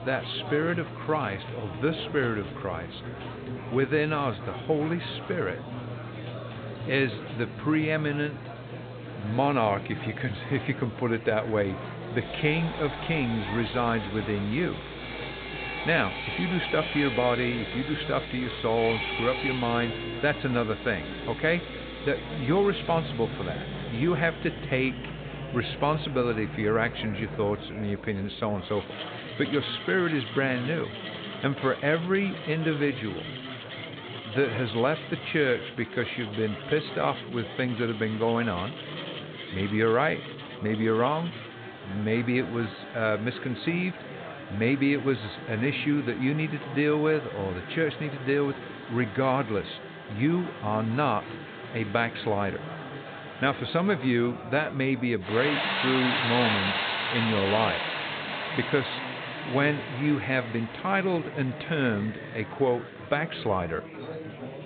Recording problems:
high frequencies cut off; severe; nothing above 4 kHz
machinery noise; loud; throughout; 9 dB below the speech
background music; noticeable; until 30 s; 15 dB below the speech
murmuring crowd; noticeable; throughout; 10 dB below the speech

